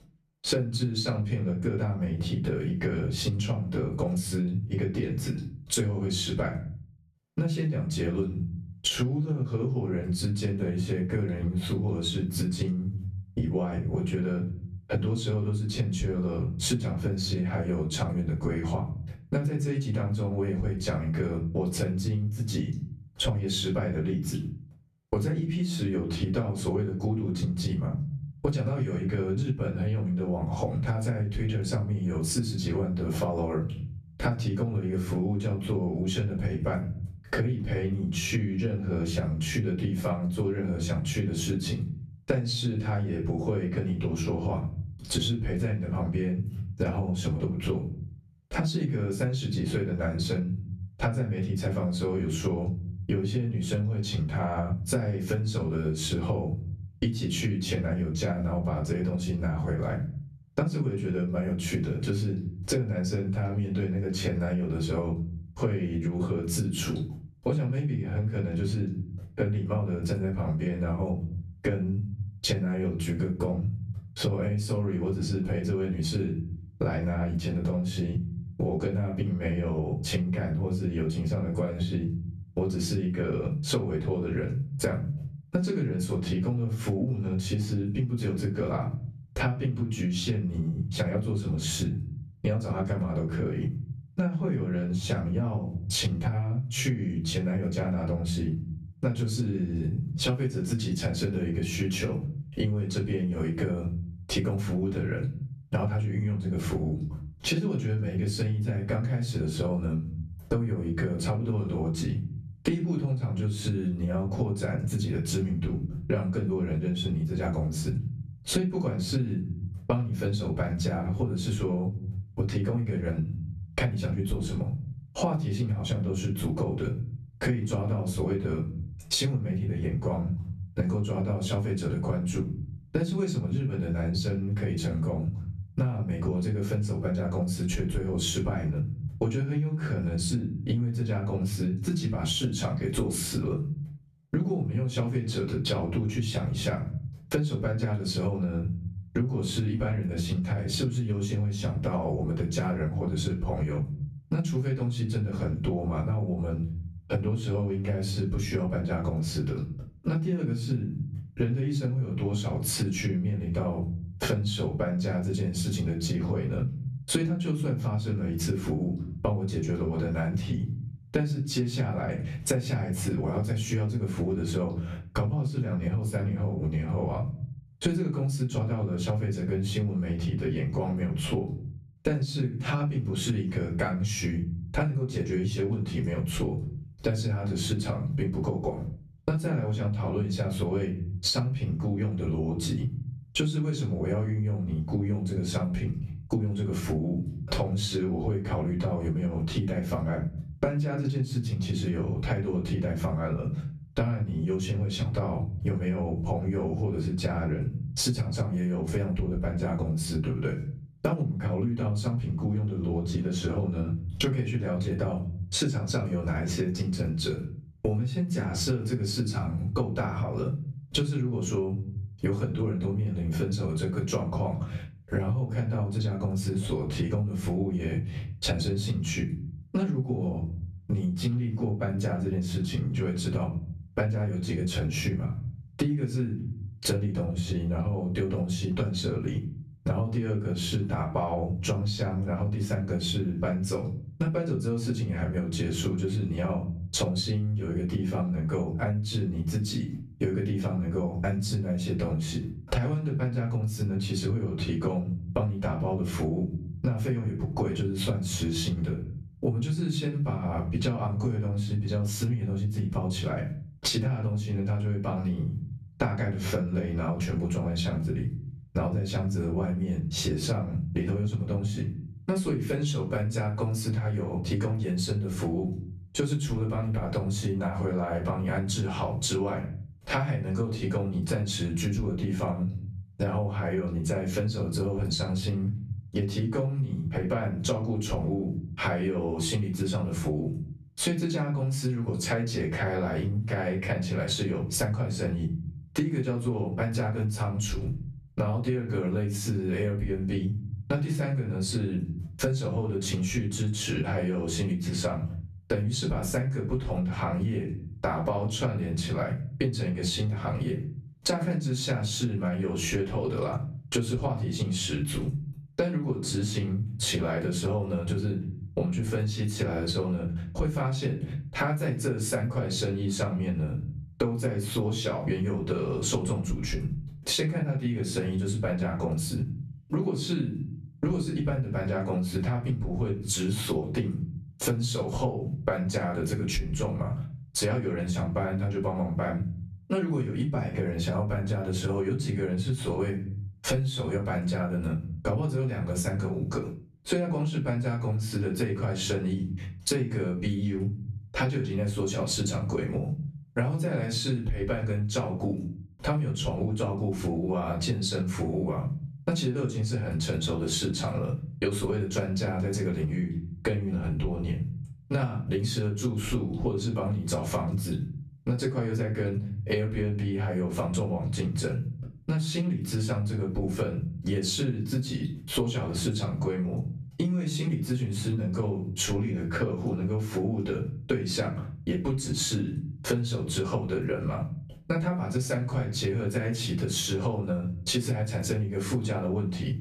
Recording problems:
off-mic speech; far
room echo; very slight; dies away in 0.4 s
squashed, flat; somewhat

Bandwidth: 14.5 kHz